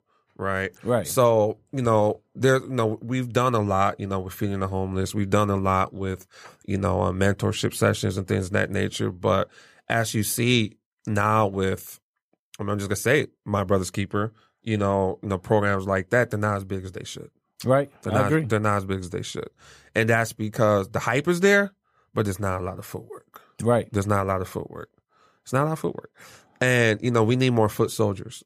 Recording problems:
none

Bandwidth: 15 kHz